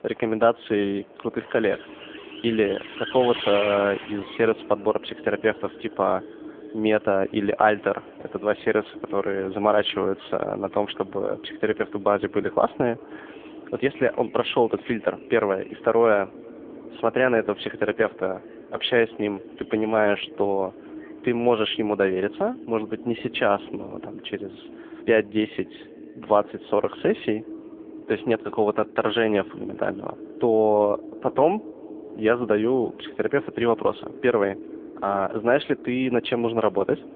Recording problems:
phone-call audio; poor line; nothing above 3.5 kHz
echo of what is said; noticeable; throughout; 380 ms later, 15 dB below the speech
traffic noise; noticeable; throughout; 15 dB below the speech

